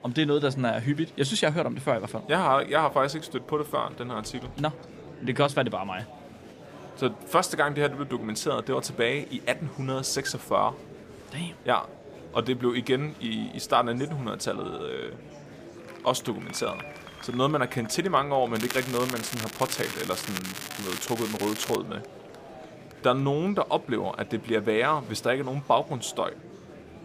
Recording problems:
crackling; loud; from 19 to 22 s; 7 dB below the speech
murmuring crowd; noticeable; throughout; 15 dB below the speech

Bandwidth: 15 kHz